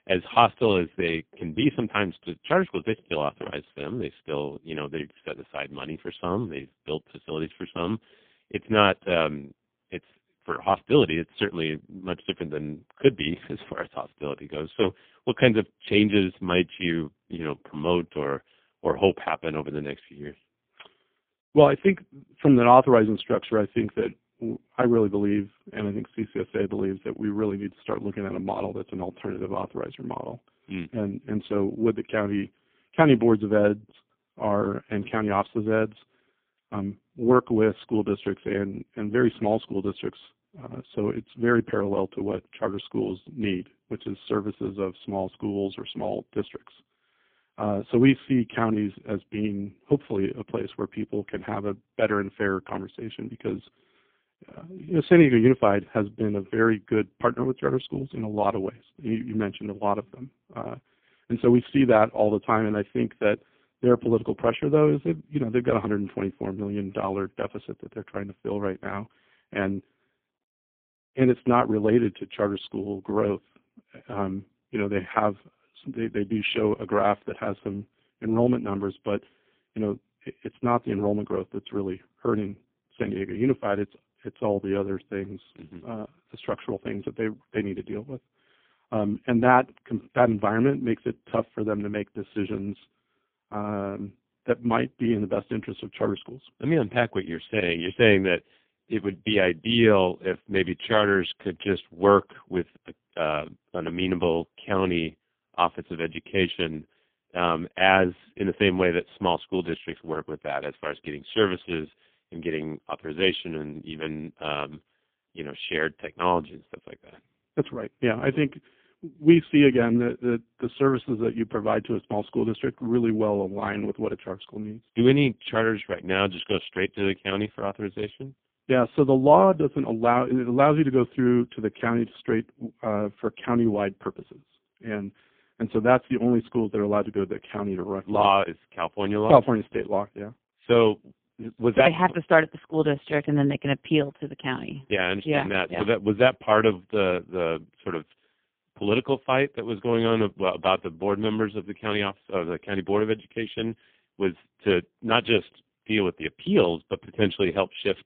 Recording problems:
phone-call audio; poor line; nothing above 3.5 kHz

